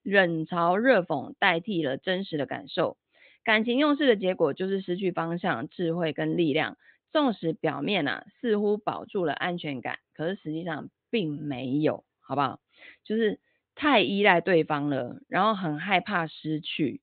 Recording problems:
high frequencies cut off; severe; nothing above 4 kHz

